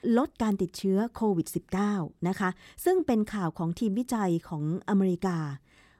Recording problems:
none

